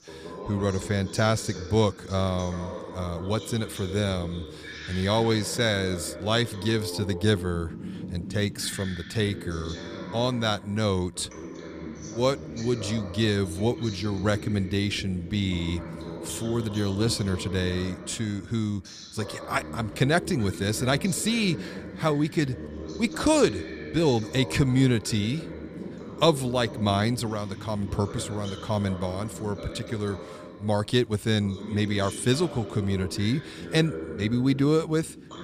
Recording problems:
voice in the background; noticeable; throughout; 10 dB below the speech

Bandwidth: 15 kHz